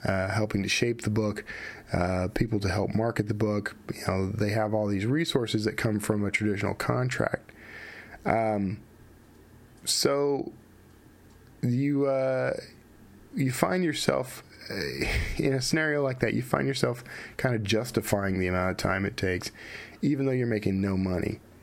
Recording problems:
squashed, flat; heavily

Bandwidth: 16.5 kHz